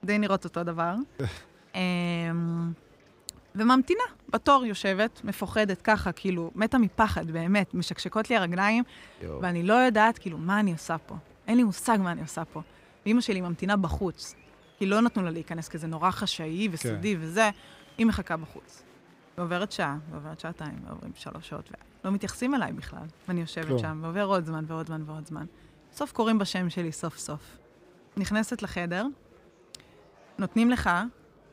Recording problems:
murmuring crowd; faint; throughout; 30 dB below the speech

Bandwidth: 15.5 kHz